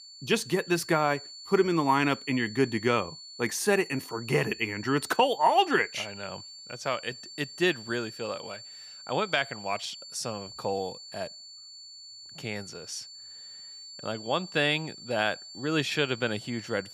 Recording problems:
high-pitched whine; noticeable; throughout; 4.5 kHz, 15 dB below the speech

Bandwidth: 15 kHz